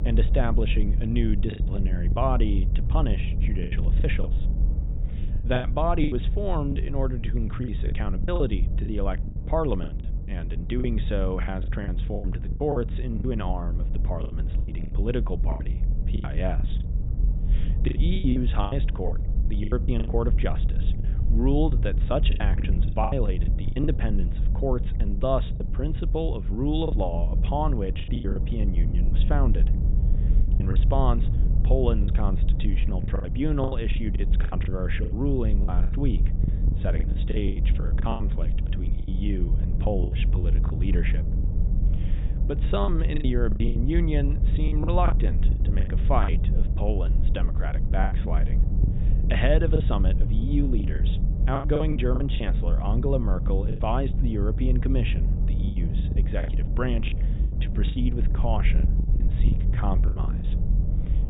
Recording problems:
high frequencies cut off; severe; nothing above 4 kHz
low rumble; noticeable; throughout; 10 dB below the speech
choppy; very; 12% of the speech affected

